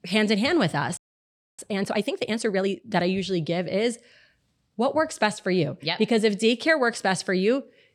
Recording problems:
audio freezing; at 1 s for 0.5 s

